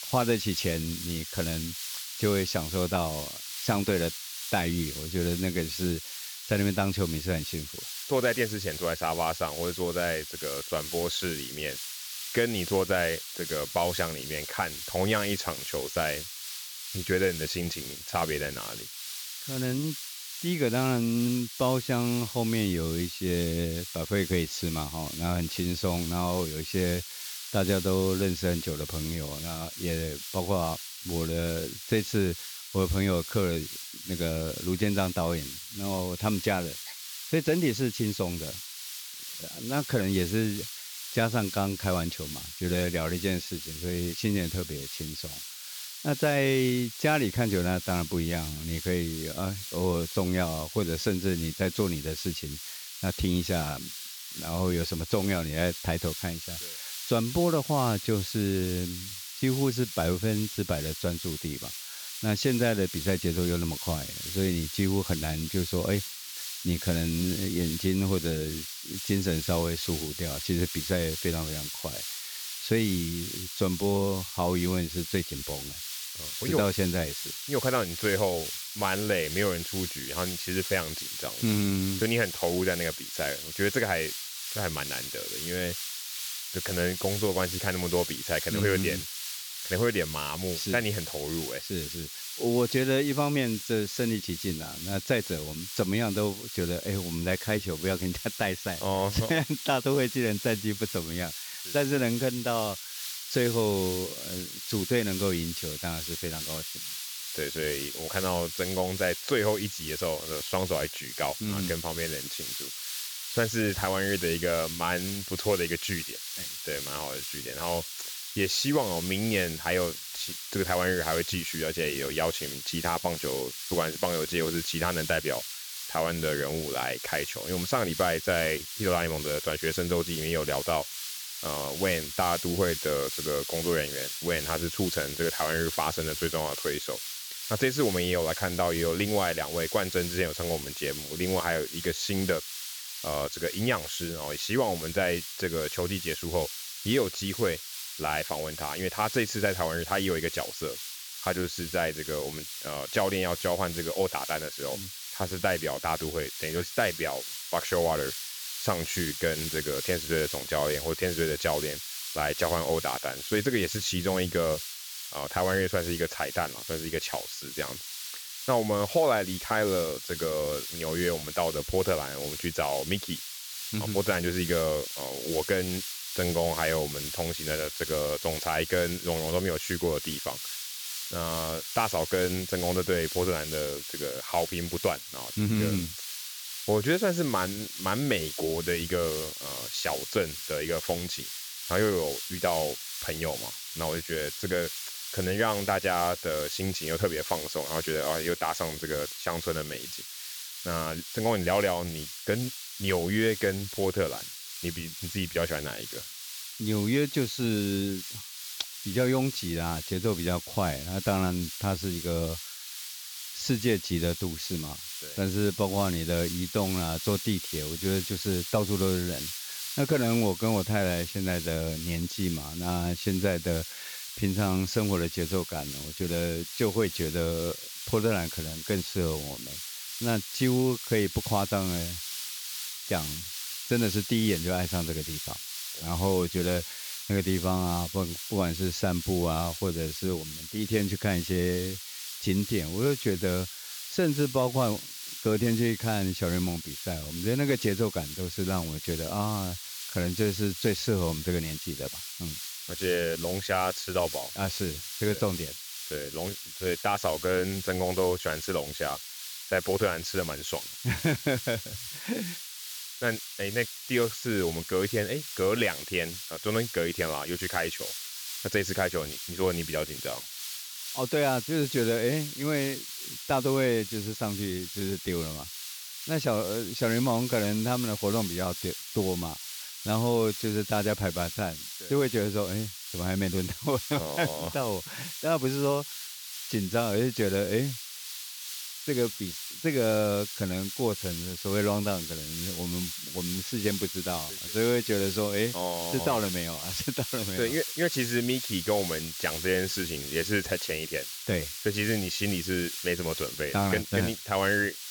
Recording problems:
high frequencies cut off; noticeable; nothing above 7.5 kHz
hiss; loud; throughout; 6 dB below the speech

